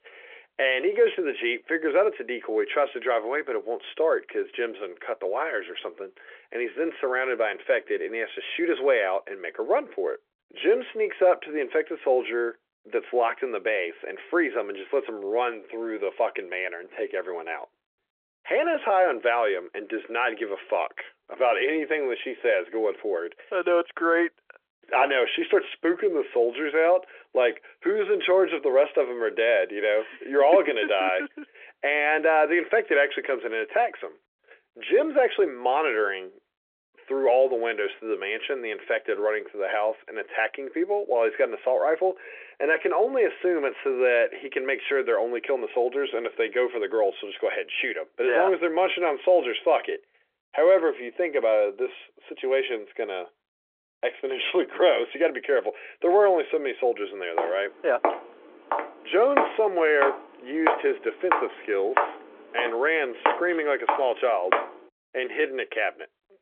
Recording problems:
phone-call audio; nothing above 3.5 kHz
footsteps; loud; from 57 s to 1:05; peak level with the speech

